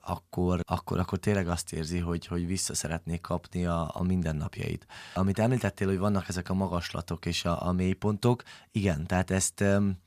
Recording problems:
none

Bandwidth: 14.5 kHz